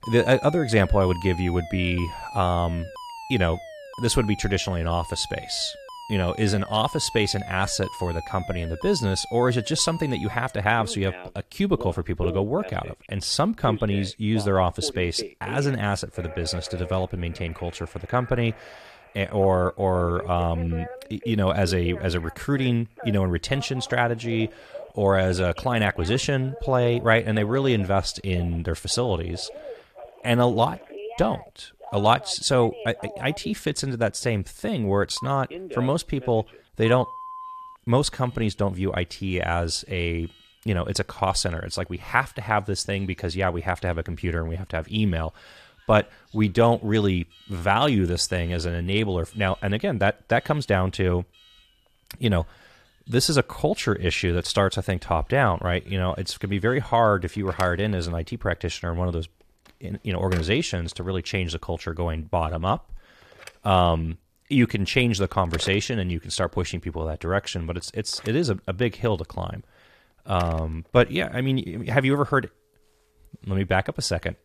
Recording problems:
alarms or sirens; noticeable; throughout; 15 dB below the speech

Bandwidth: 14.5 kHz